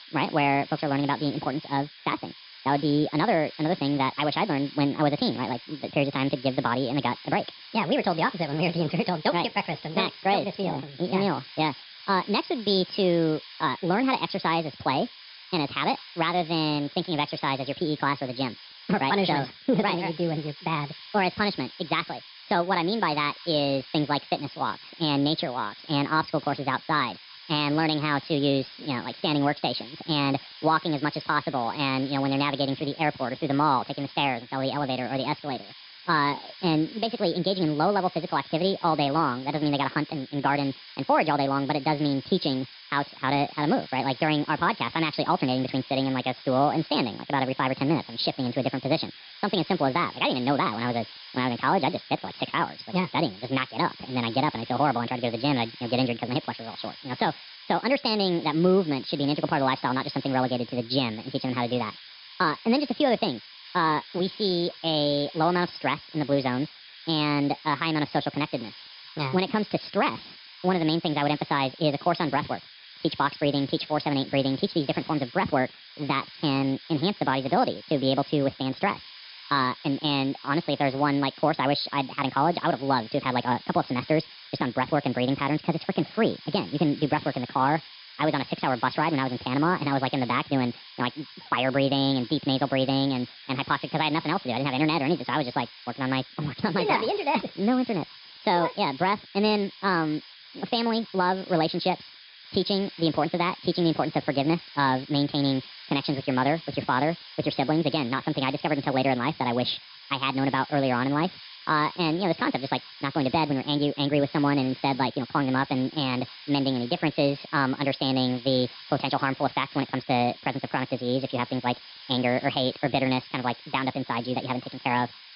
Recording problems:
wrong speed and pitch; too fast and too high; 1.5 times normal speed
high frequencies cut off; noticeable; nothing above 5.5 kHz
hiss; noticeable; throughout; 15 dB below the speech

